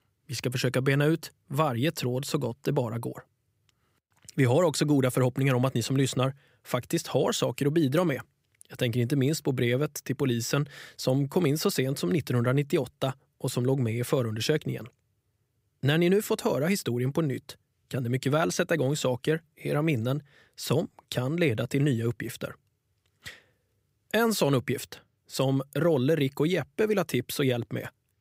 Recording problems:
none

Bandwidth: 15.5 kHz